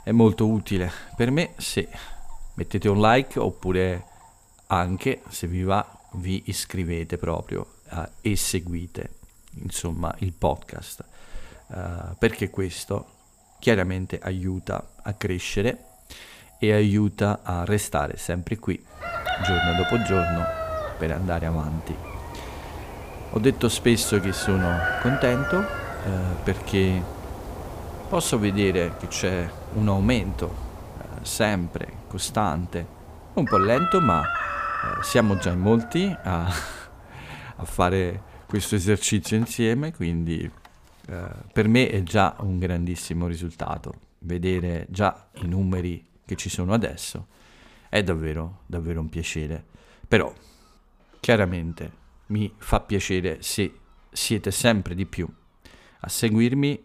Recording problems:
animal sounds; loud; throughout; 6 dB below the speech

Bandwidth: 15 kHz